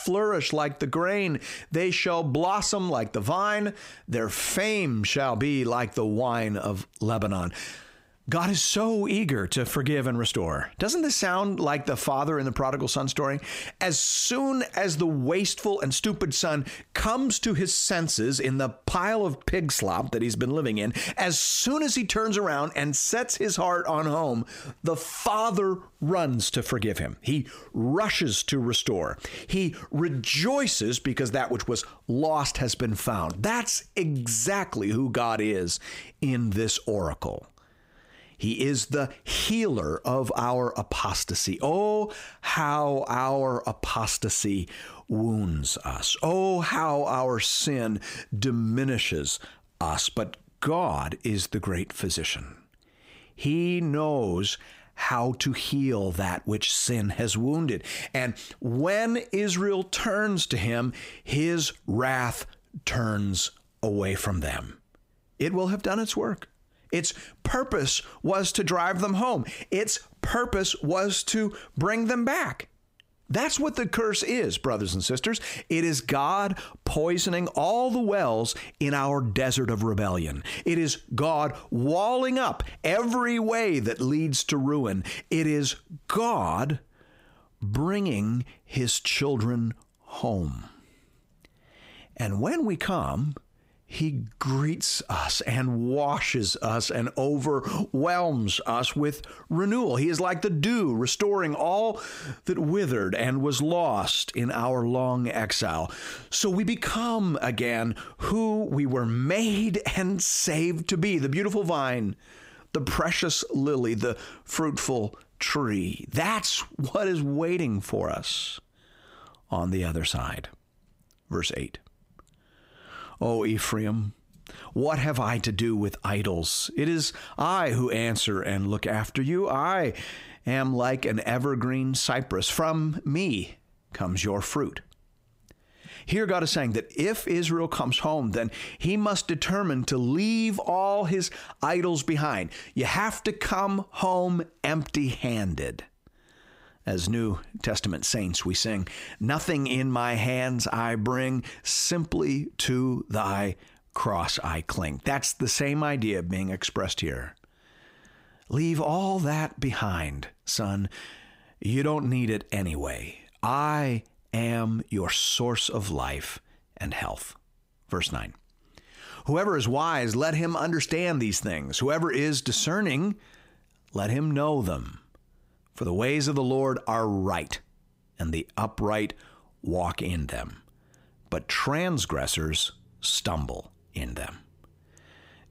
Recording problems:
squashed, flat; heavily

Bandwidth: 15.5 kHz